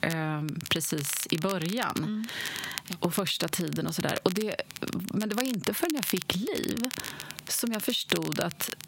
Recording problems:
squashed, flat; heavily
crackle, like an old record; loud; 8 dB below the speech

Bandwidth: 16 kHz